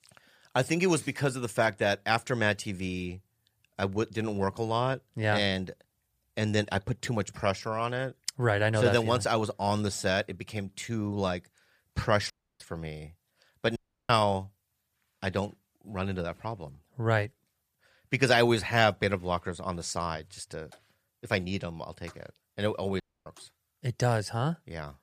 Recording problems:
audio cutting out; at 12 s, at 14 s and at 23 s

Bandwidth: 14.5 kHz